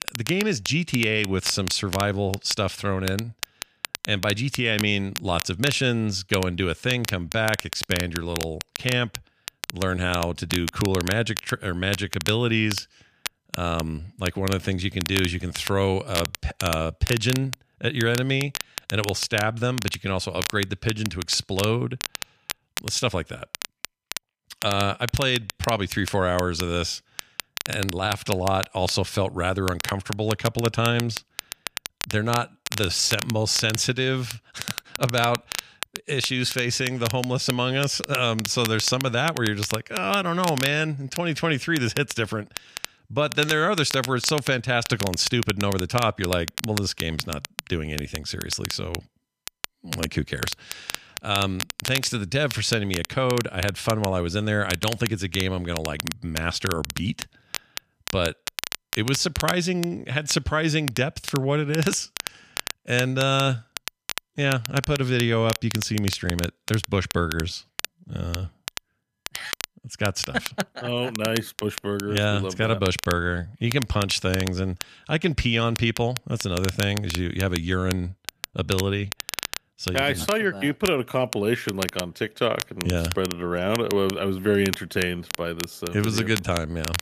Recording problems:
crackle, like an old record; loud; 9 dB below the speech

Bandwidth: 14.5 kHz